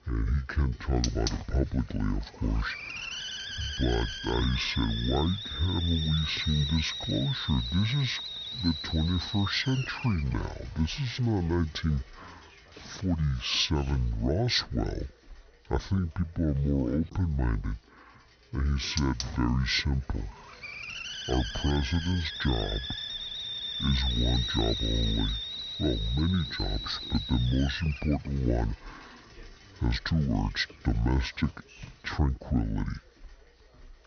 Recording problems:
wrong speed and pitch; too slow and too low; 0.6 times normal speed
high frequencies cut off; noticeable; nothing above 6 kHz
hiss; loud; throughout; 5 dB below the speech

